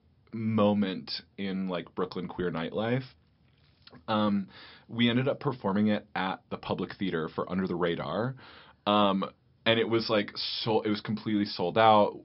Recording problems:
high frequencies cut off; noticeable; nothing above 5.5 kHz

